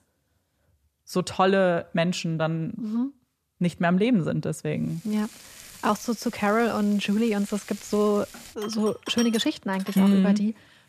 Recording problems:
household noises; noticeable; from 5 s on; 15 dB below the speech

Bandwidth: 14.5 kHz